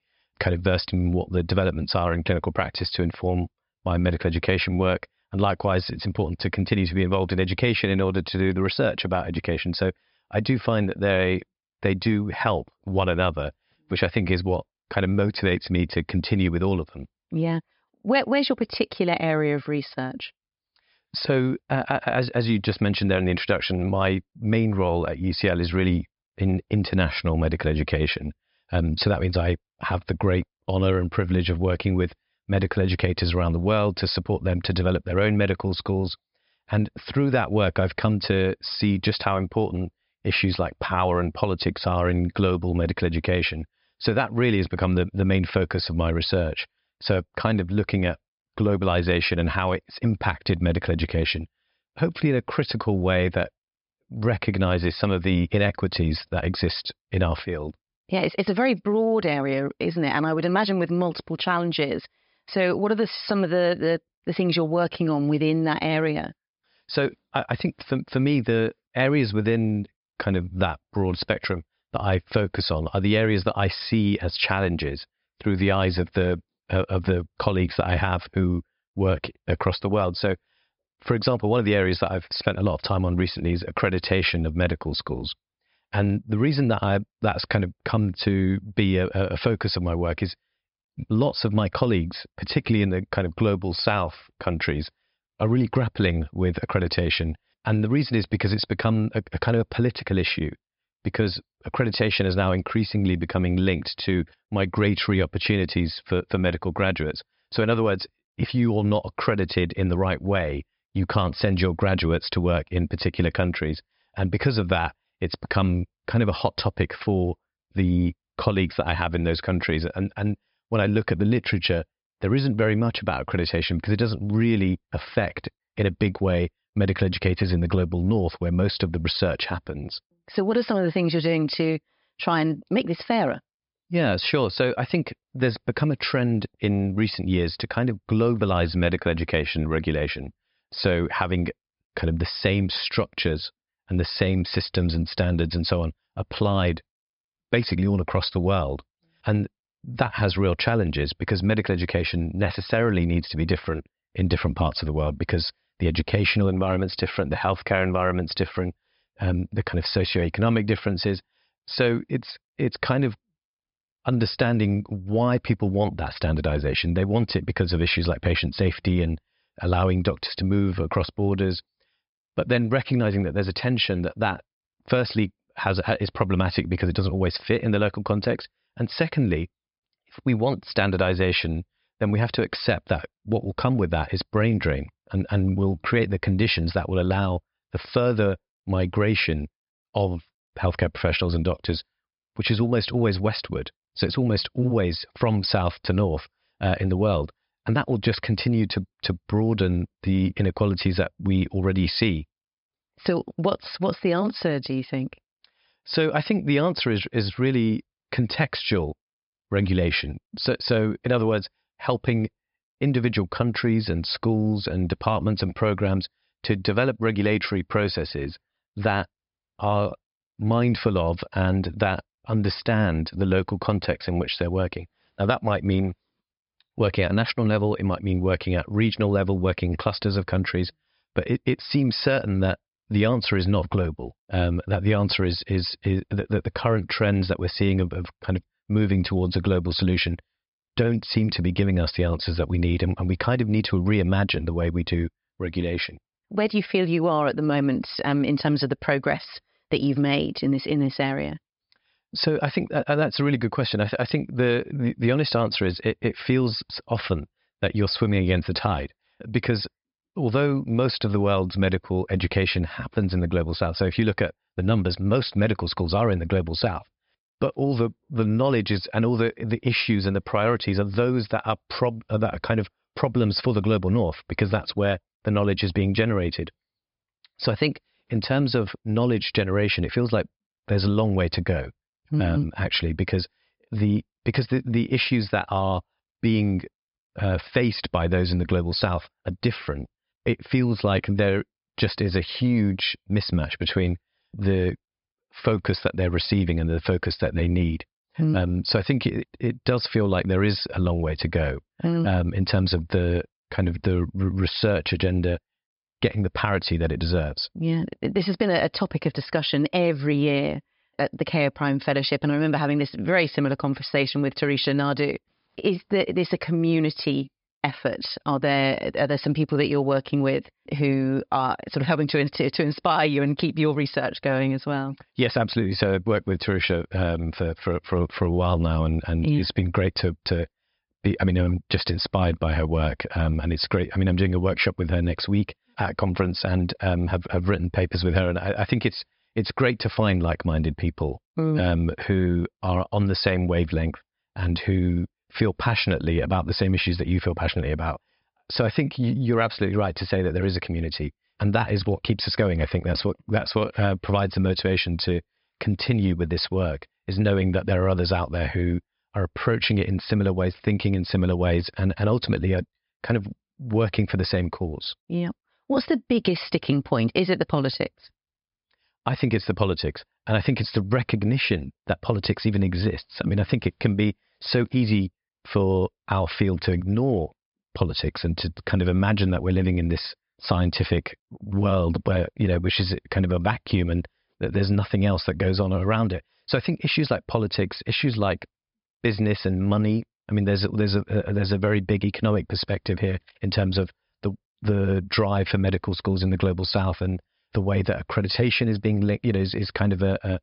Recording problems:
high frequencies cut off; noticeable; nothing above 5 kHz

